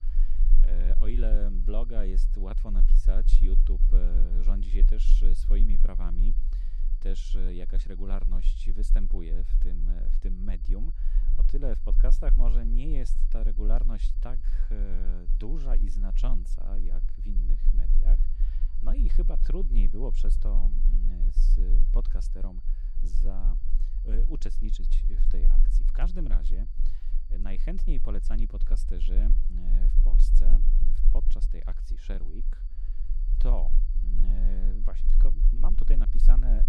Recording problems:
low rumble; loud; throughout; 10 dB below the speech
high-pitched whine; faint; throughout; 4.5 kHz, 35 dB below the speech

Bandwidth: 14.5 kHz